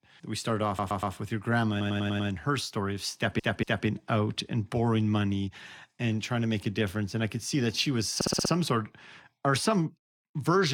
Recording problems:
audio stuttering; 4 times, first at 0.5 s
abrupt cut into speech; at the end

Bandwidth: 18.5 kHz